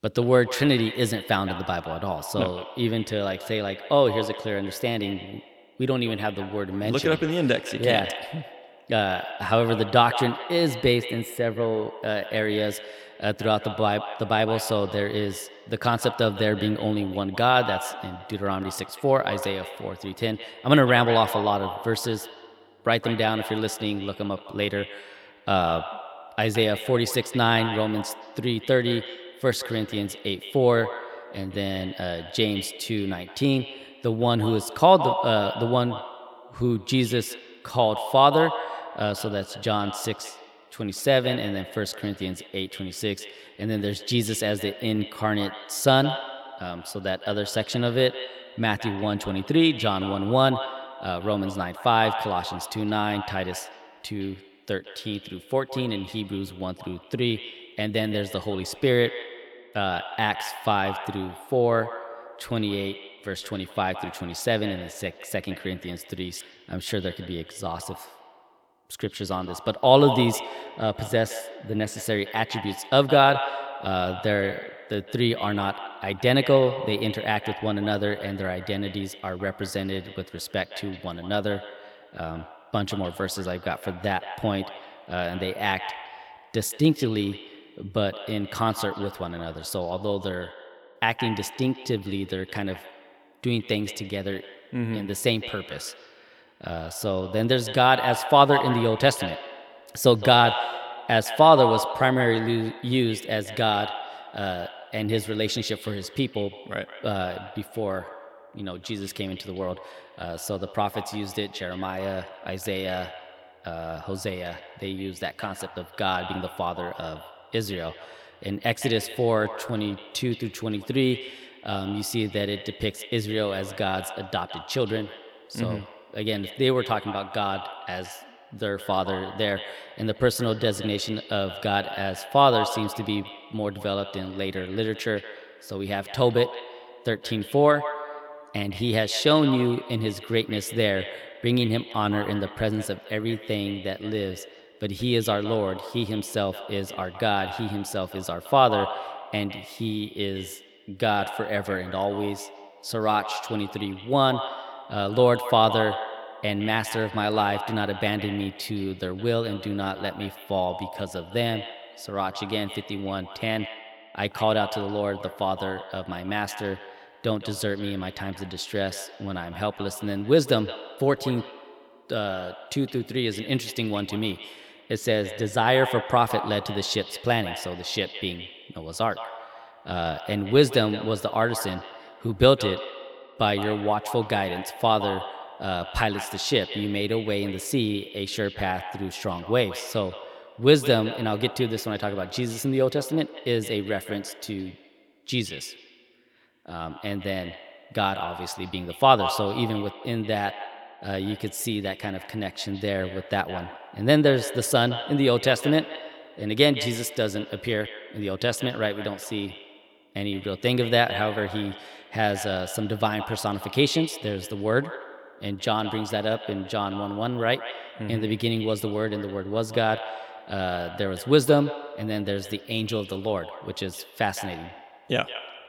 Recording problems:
echo of what is said; strong; throughout; 160 ms later, 10 dB below the speech

